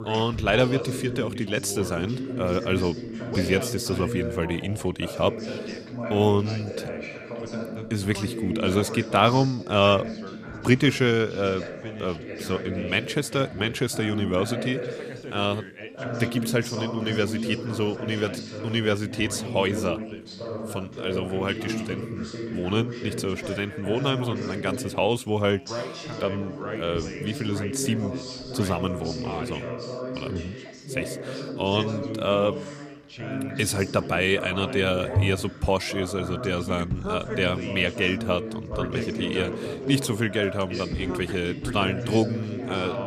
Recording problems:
background chatter; loud; throughout; 3 voices, 7 dB below the speech

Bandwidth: 15 kHz